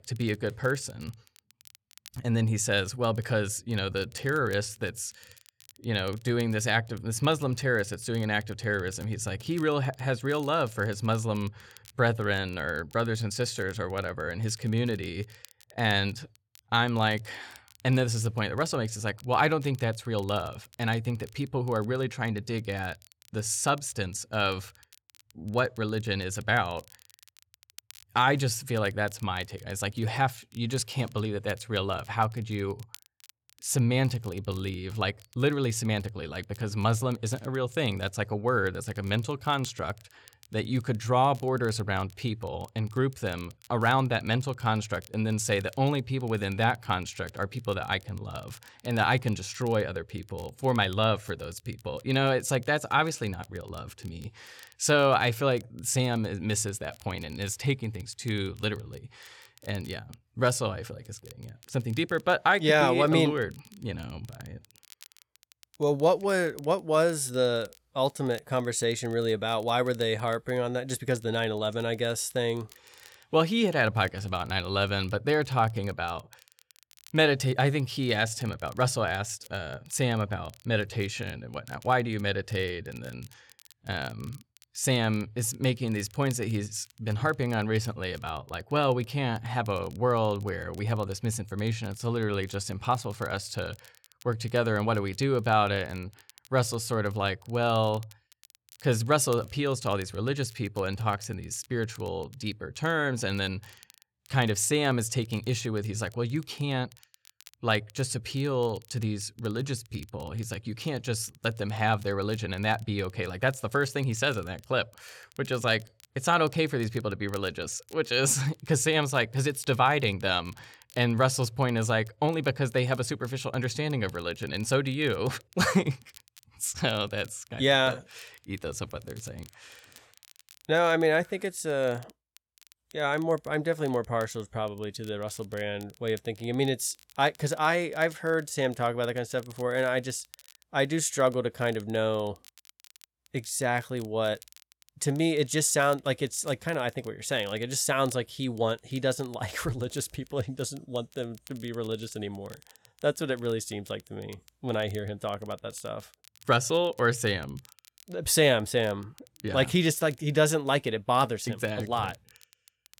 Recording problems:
crackle, like an old record; faint; 25 dB below the speech

